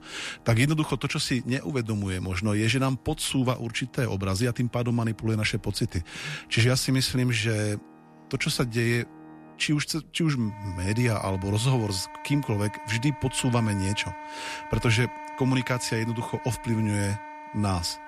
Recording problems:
background music; noticeable; throughout; 15 dB below the speech

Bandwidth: 13.5 kHz